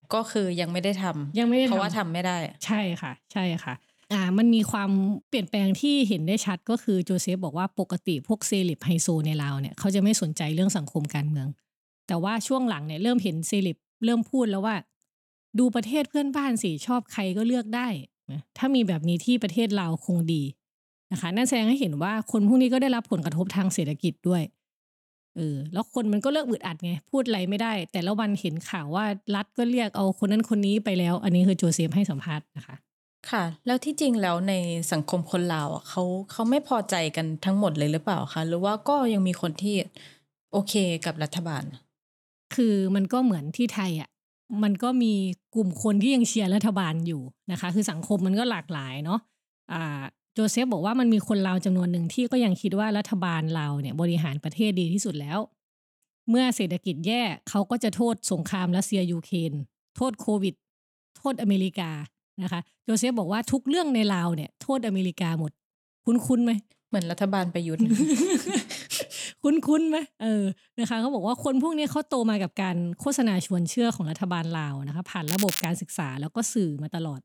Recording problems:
crackling; loud; at 1:15; 4 dB below the speech

